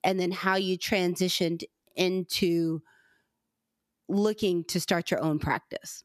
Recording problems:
squashed, flat; somewhat

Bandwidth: 14.5 kHz